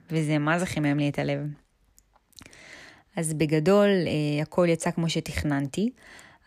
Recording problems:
none

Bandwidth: 14.5 kHz